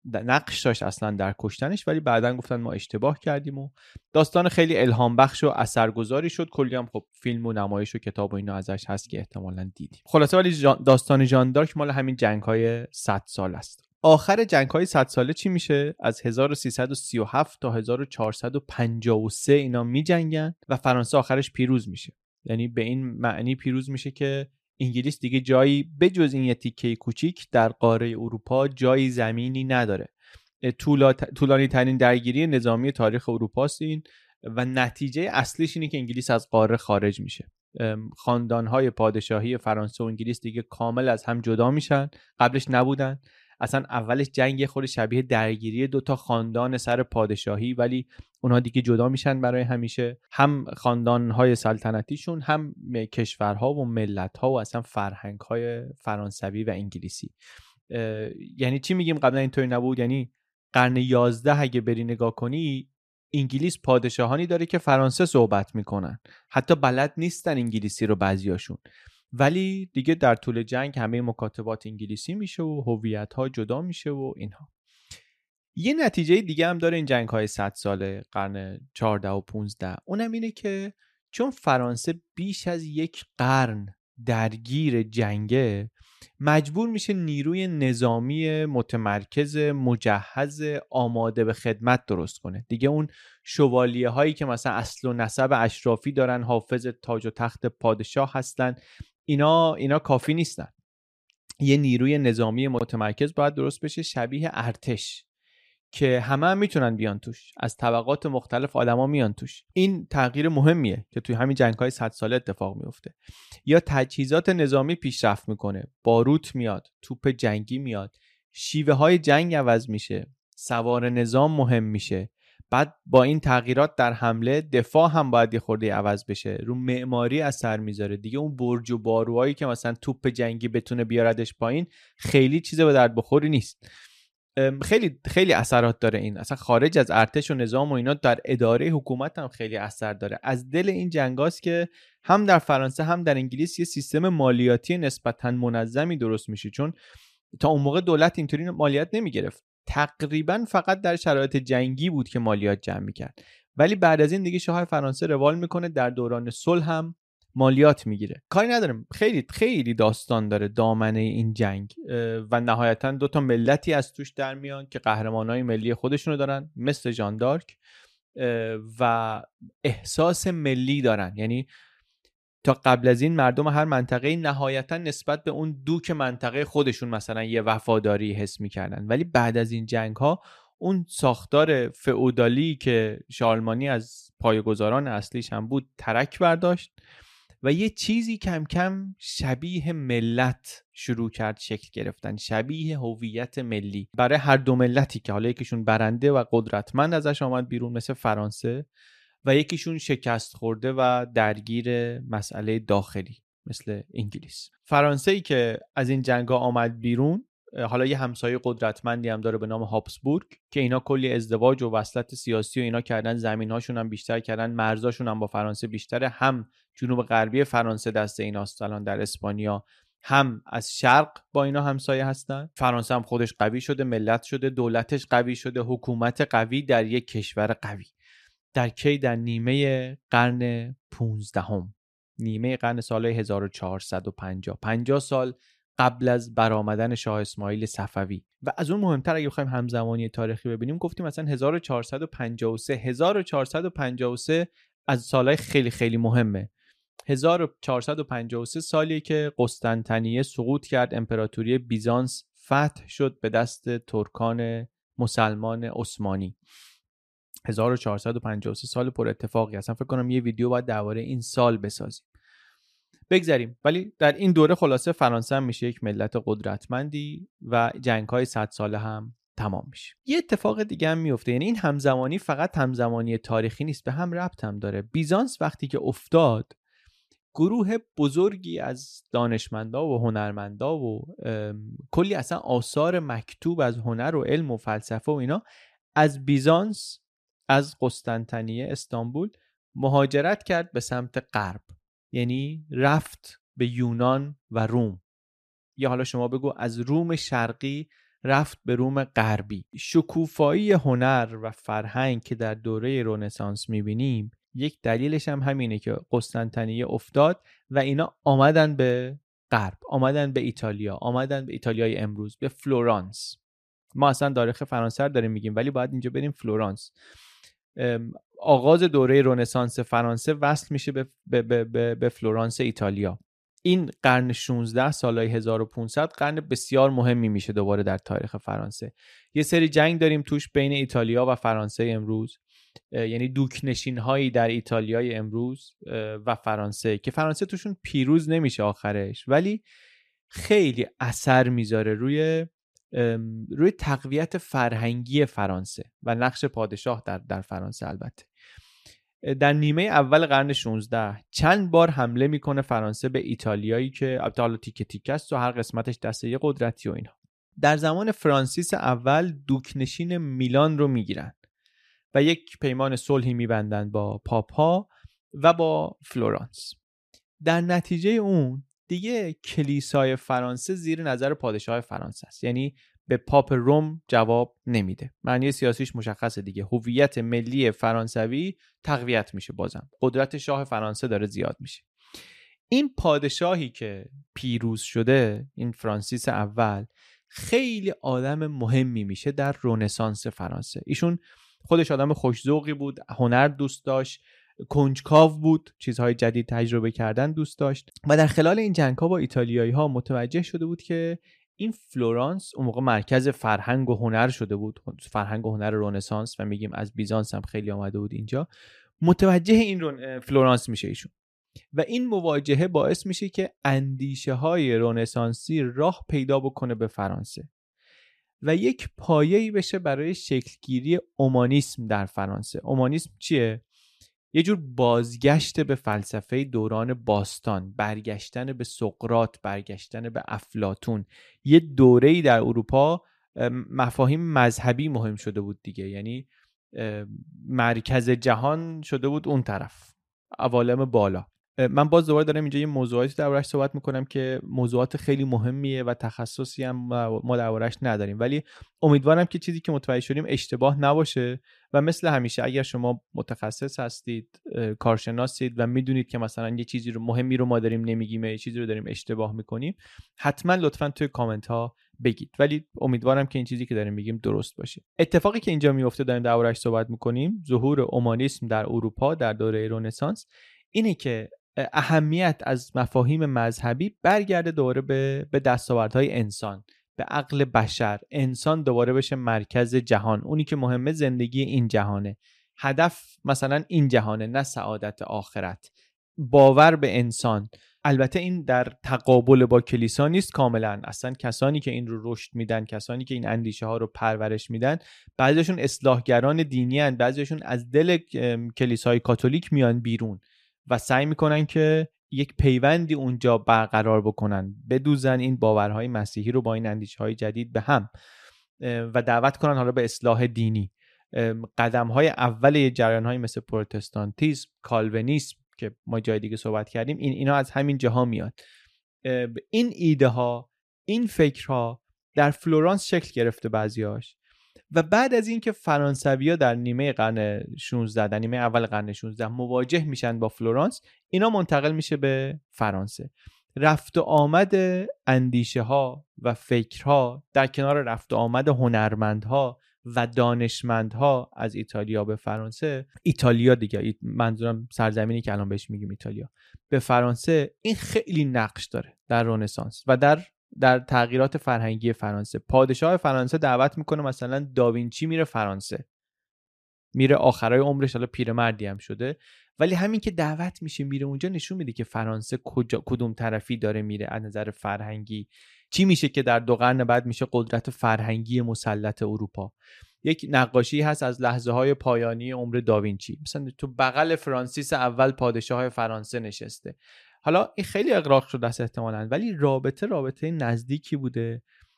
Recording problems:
none

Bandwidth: 14.5 kHz